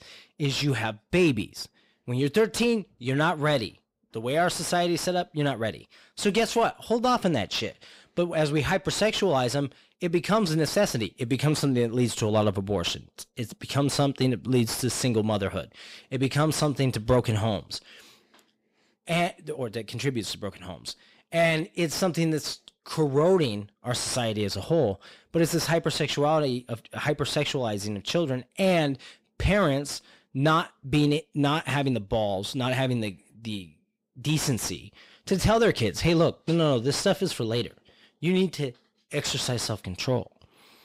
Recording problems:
distortion; slight; 10 dB below the speech

